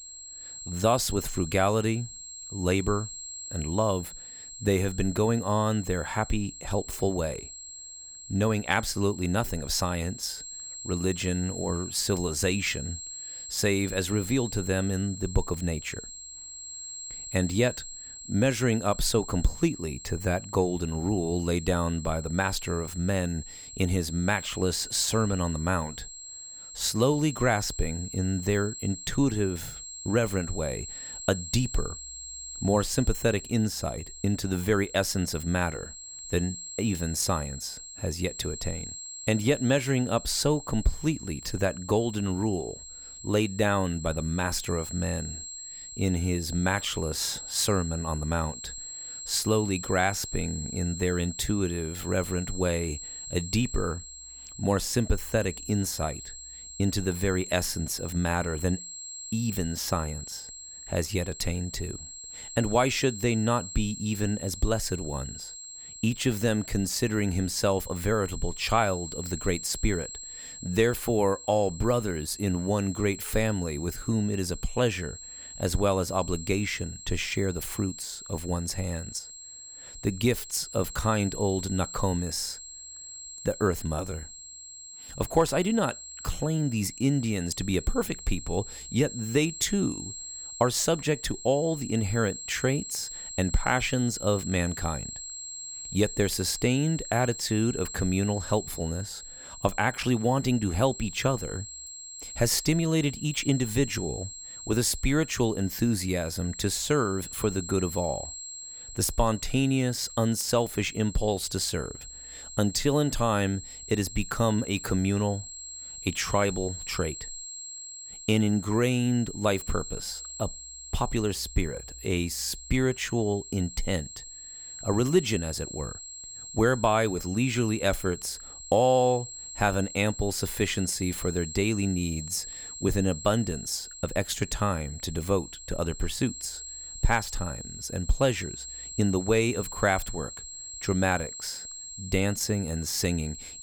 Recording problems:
high-pitched whine; noticeable; throughout; 7.5 kHz, 10 dB below the speech

